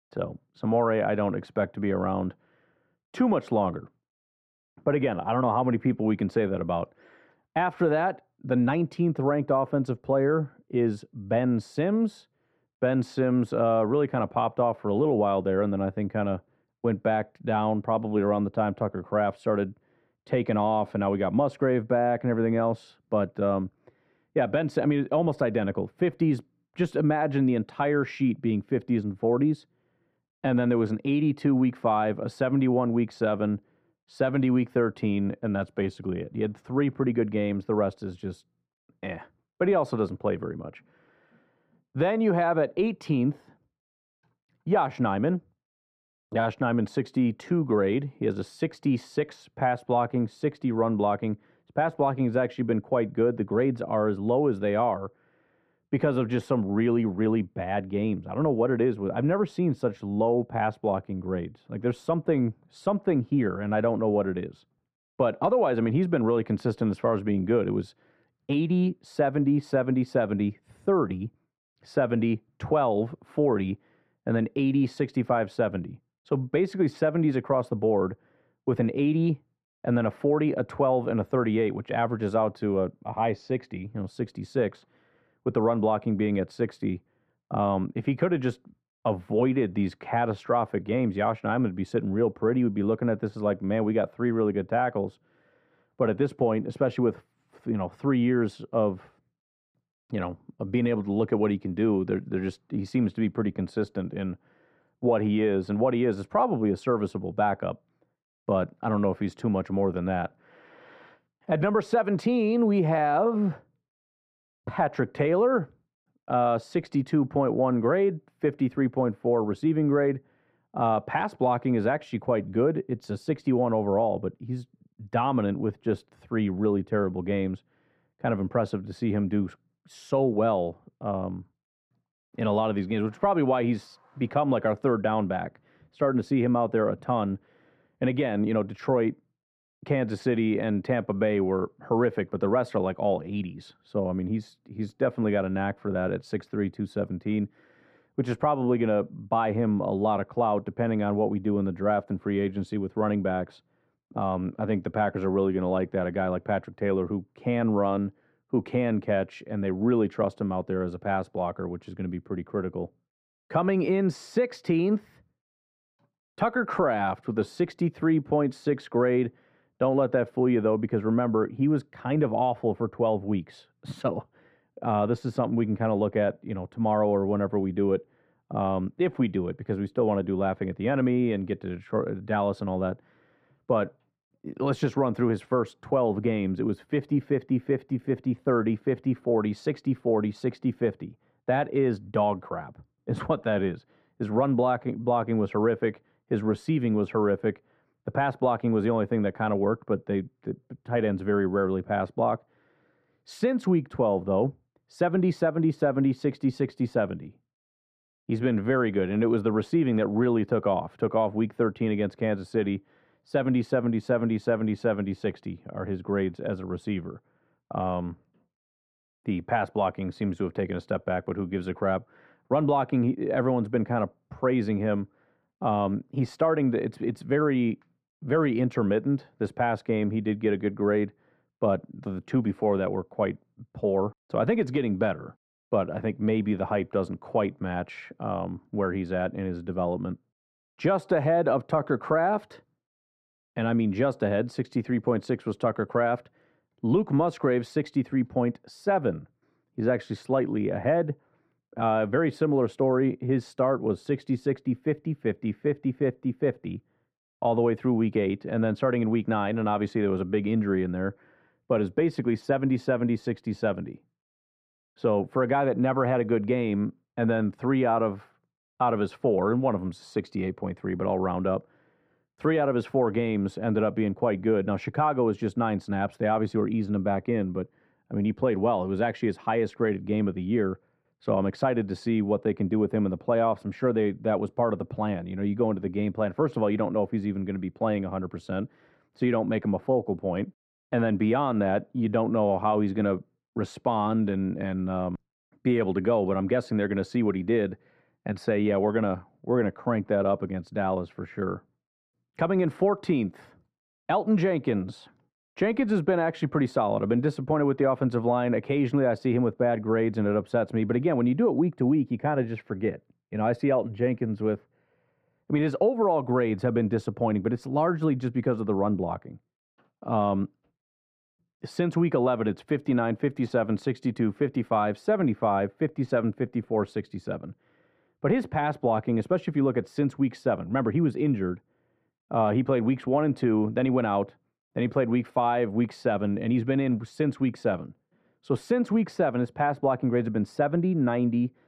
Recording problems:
muffled; very; fading above 4 kHz

